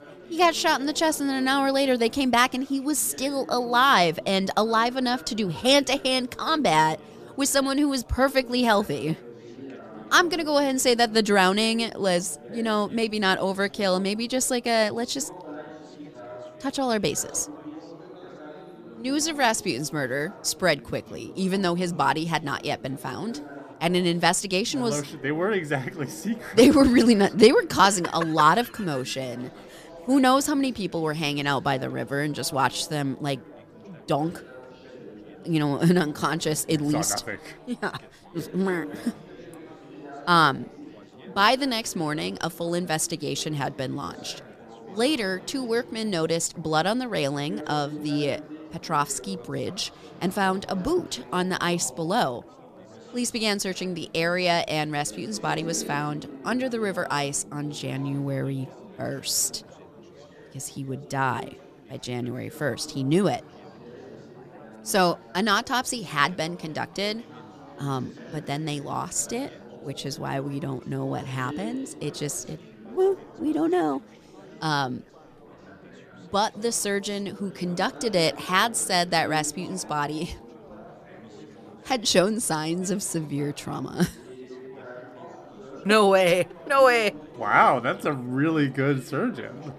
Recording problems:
chatter from many people; noticeable; throughout; 20 dB below the speech

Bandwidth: 14.5 kHz